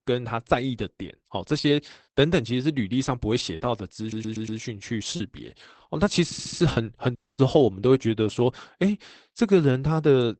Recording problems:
garbled, watery; badly; nothing above 8 kHz
choppy; occasionally; at 1.5 s, from 3.5 to 5 s and at 6.5 s; 3% of the speech affected
audio stuttering; at 4 s and at 6 s
audio cutting out; at 7 s

